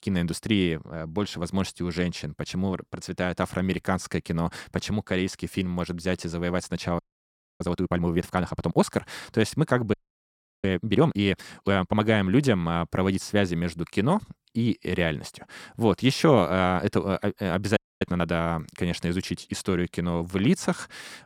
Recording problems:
audio freezing; at 7 s for 0.5 s, at 10 s for 0.5 s and at 18 s

